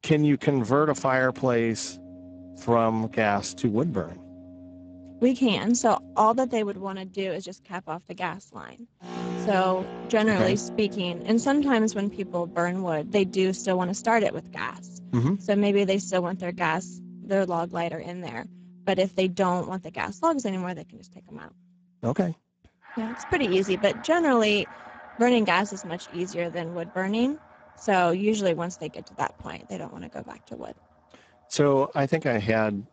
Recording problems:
garbled, watery; badly; nothing above 7.5 kHz
background music; noticeable; throughout; 15 dB below the speech

